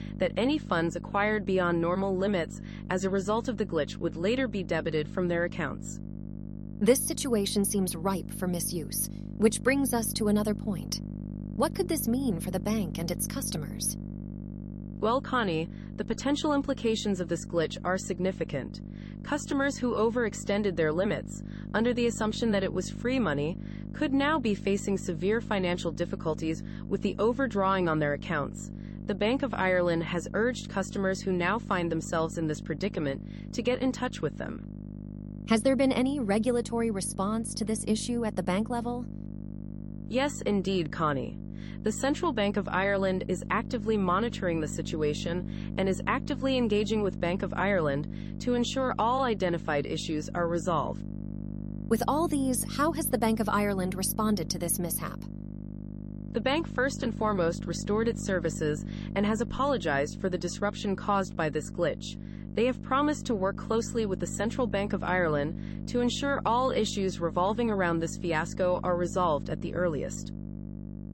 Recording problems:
electrical hum; noticeable; throughout; 50 Hz, 15 dB below the speech

